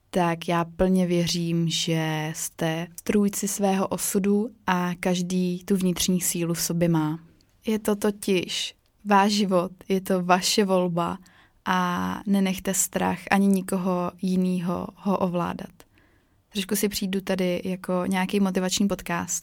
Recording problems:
none

